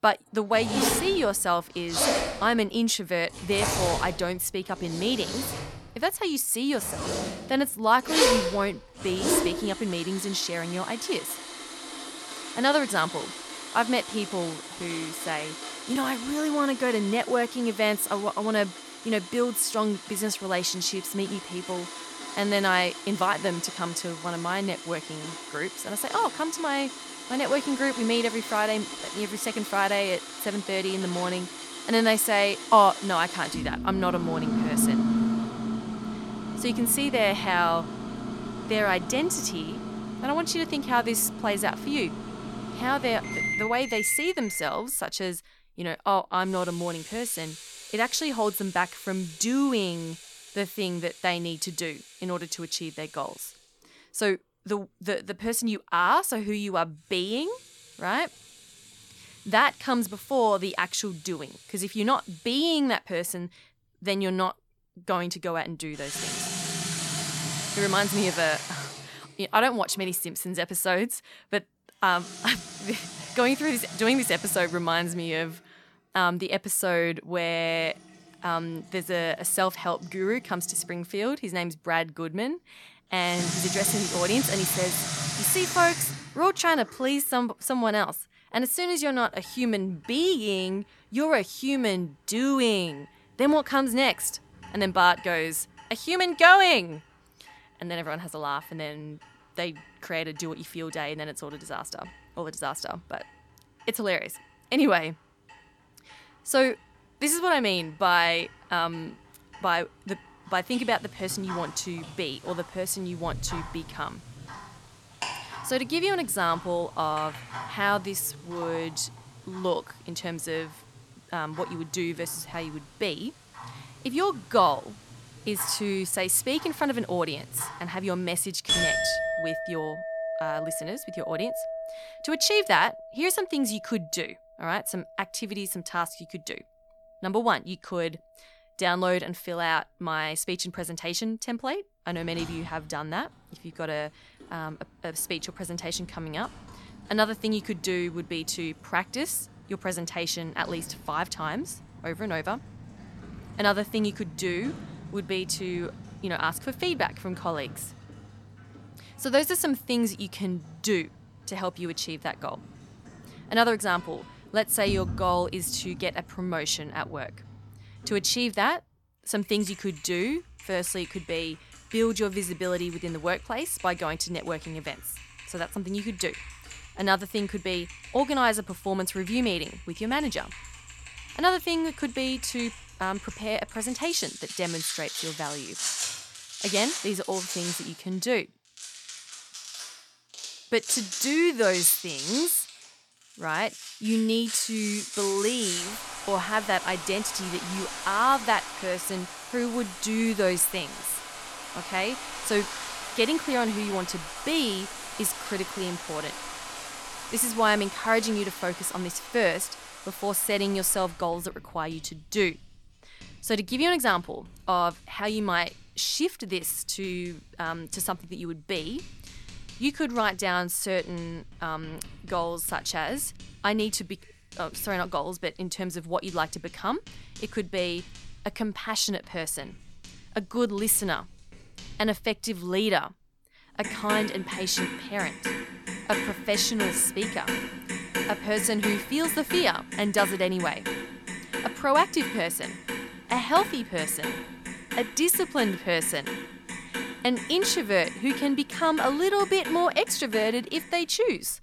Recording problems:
household noises; loud; throughout; 7 dB below the speech

